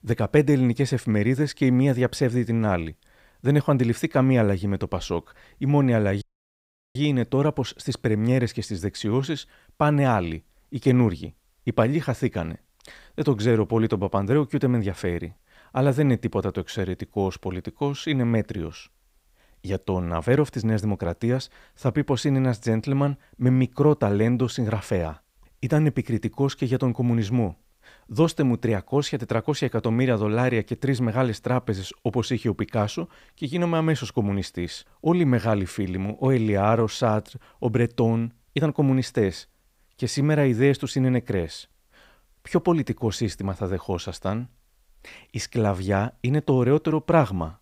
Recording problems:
audio cutting out; at 6 s for 0.5 s

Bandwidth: 15.5 kHz